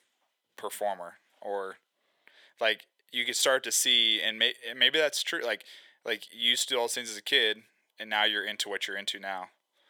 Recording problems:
thin; very; fading below 650 Hz

